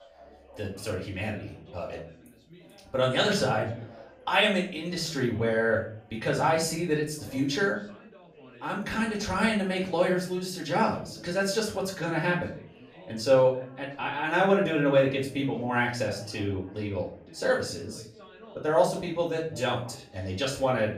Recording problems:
off-mic speech; far
room echo; slight; dies away in 0.4 s
background chatter; faint; throughout; 3 voices, 25 dB below the speech

